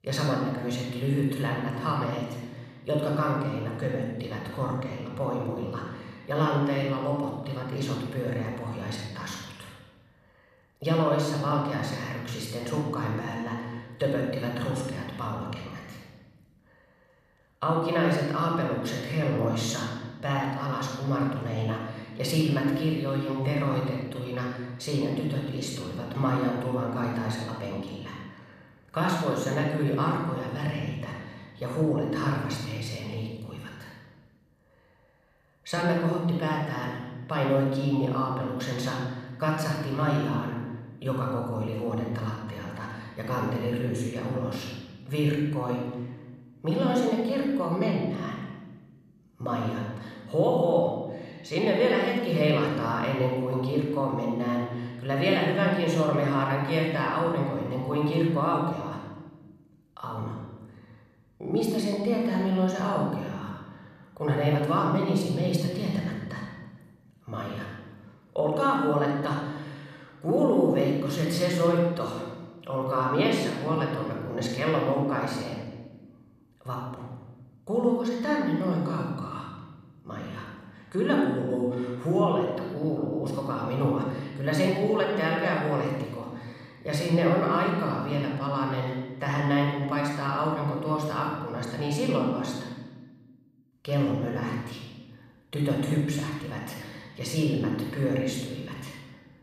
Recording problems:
room echo; noticeable; dies away in 1.2 s
off-mic speech; somewhat distant

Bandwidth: 14 kHz